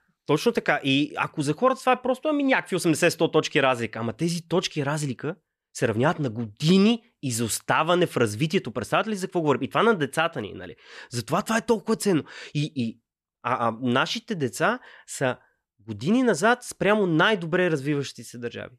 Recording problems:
none

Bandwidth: 14.5 kHz